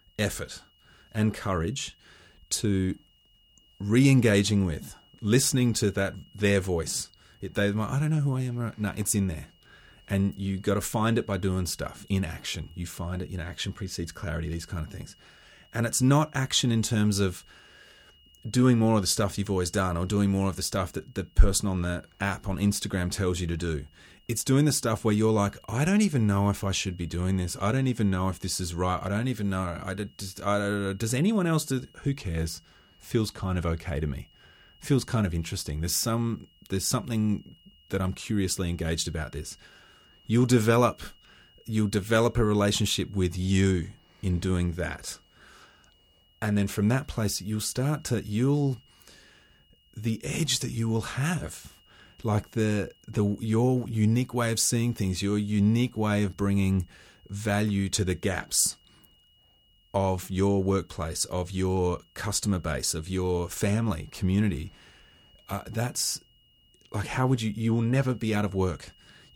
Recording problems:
high-pitched whine; faint; throughout; 3 kHz, 30 dB below the speech

